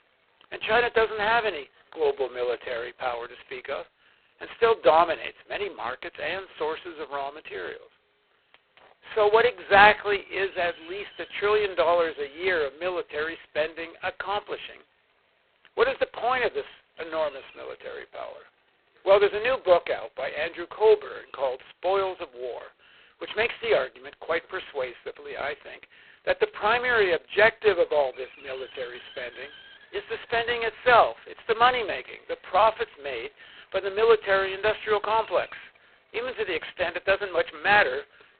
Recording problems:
phone-call audio; poor line; nothing above 4 kHz
hiss; faint; throughout; 30 dB below the speech

